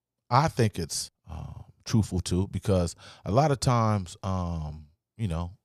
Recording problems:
none

